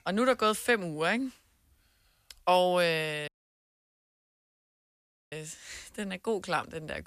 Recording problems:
audio cutting out; at 3.5 s for 2 s

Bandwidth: 14.5 kHz